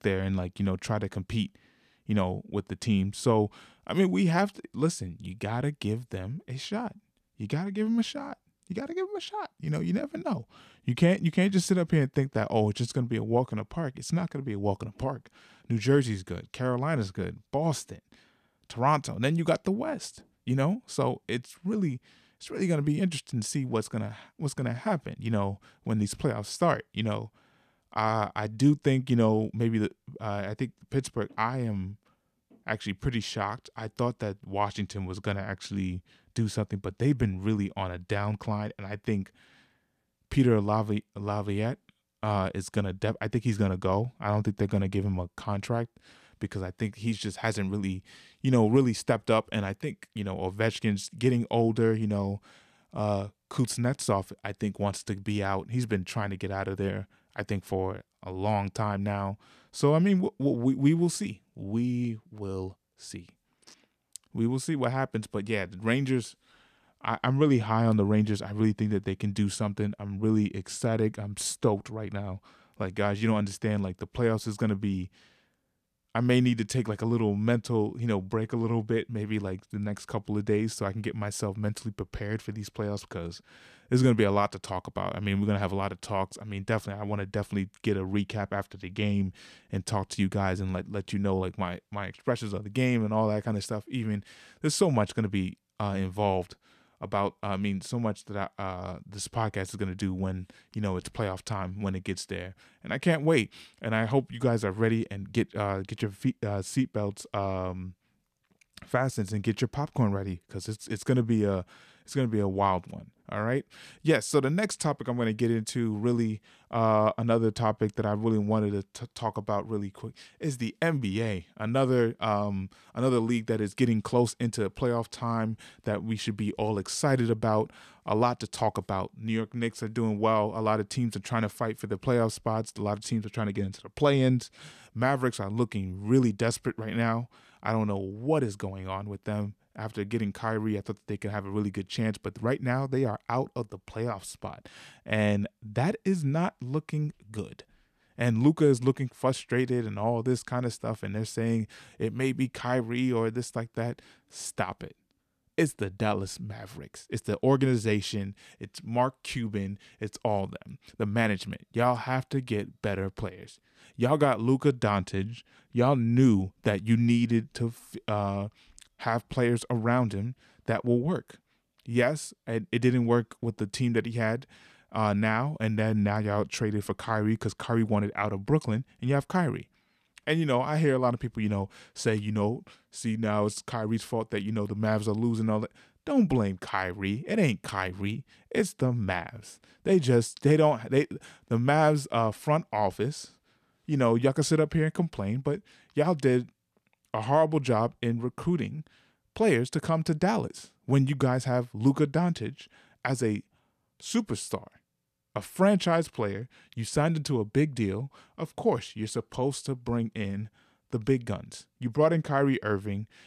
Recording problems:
none

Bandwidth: 14.5 kHz